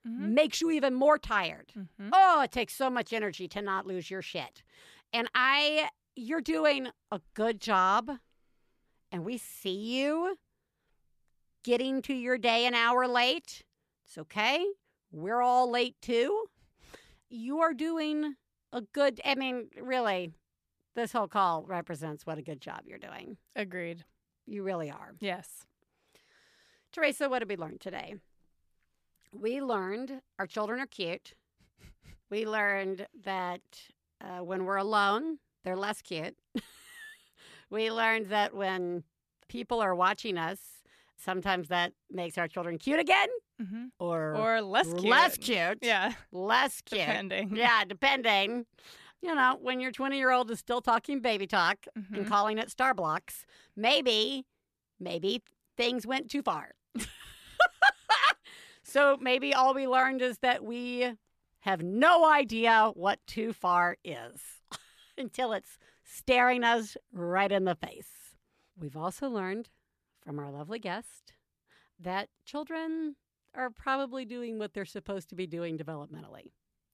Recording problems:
none

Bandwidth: 14.5 kHz